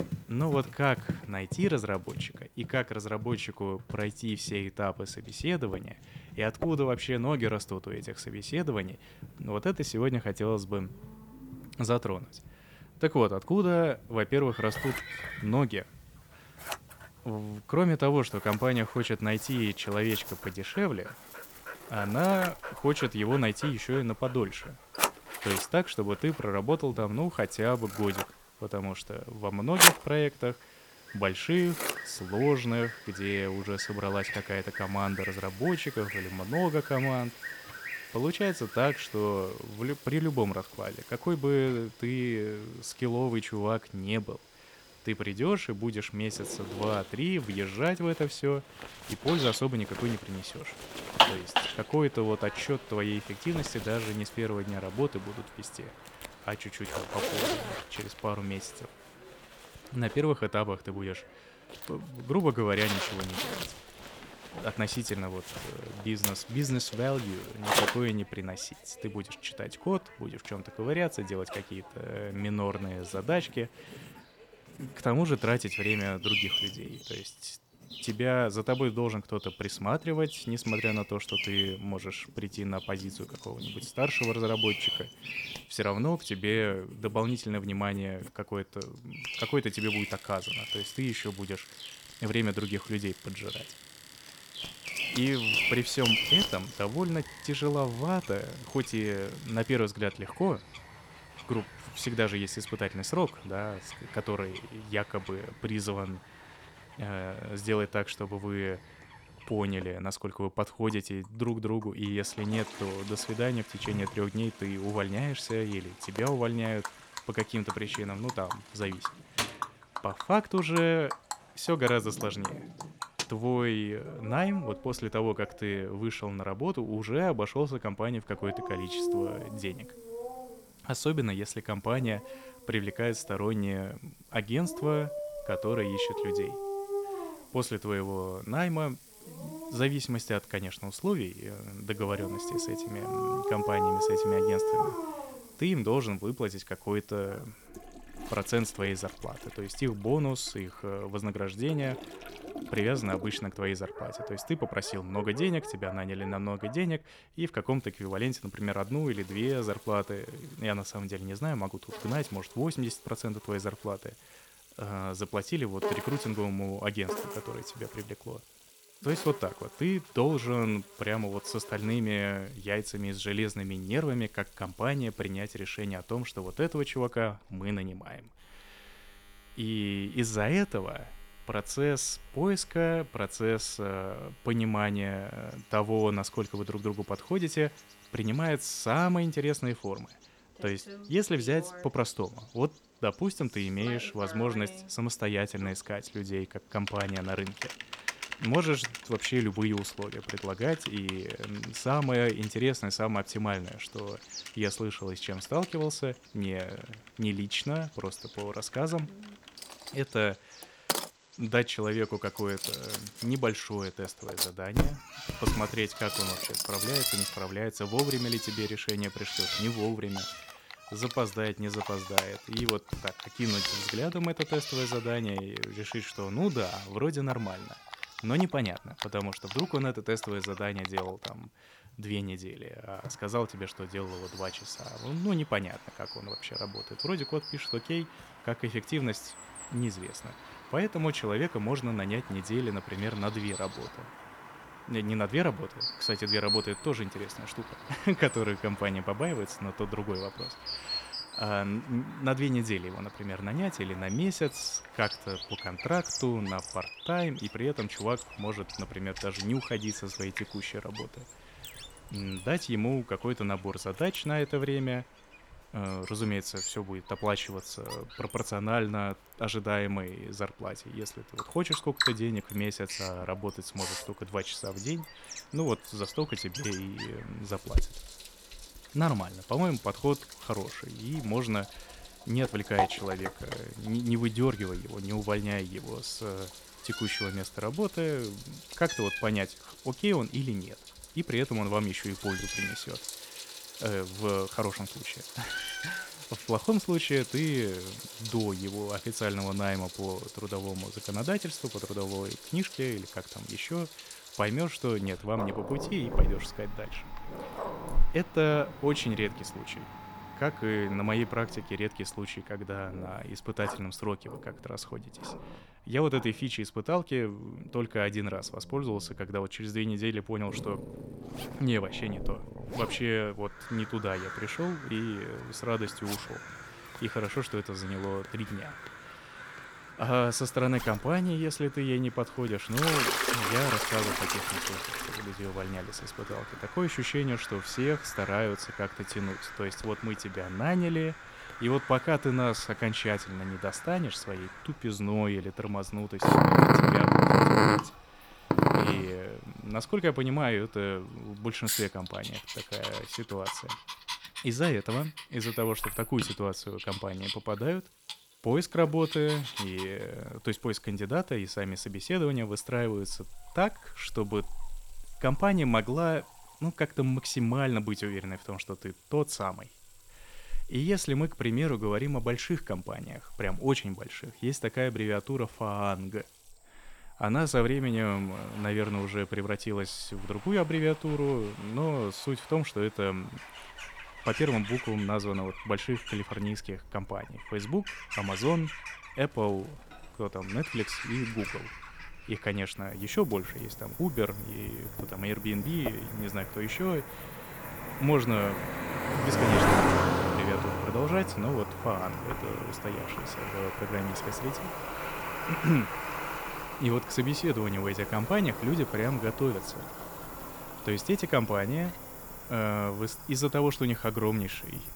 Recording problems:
animal sounds; loud; throughout; 4 dB below the speech
household noises; loud; throughout; 5 dB below the speech

